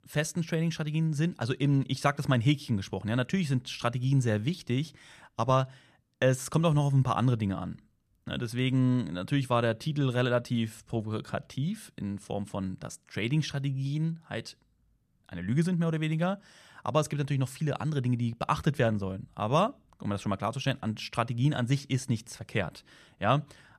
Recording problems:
none

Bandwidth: 14.5 kHz